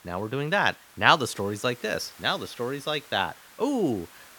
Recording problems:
hiss; faint; throughout; 20 dB below the speech

